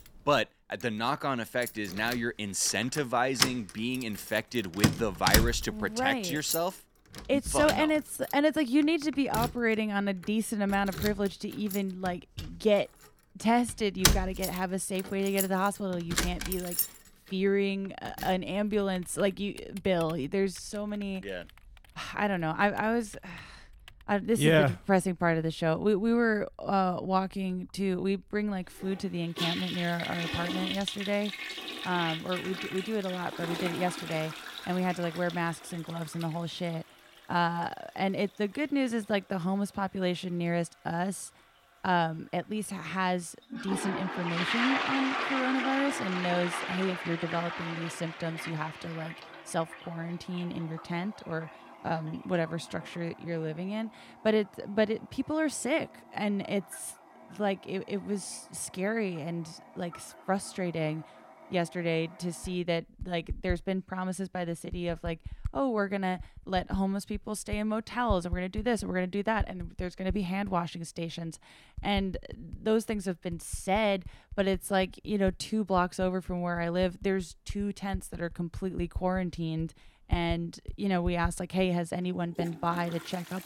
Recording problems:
household noises; loud; throughout; 5 dB below the speech

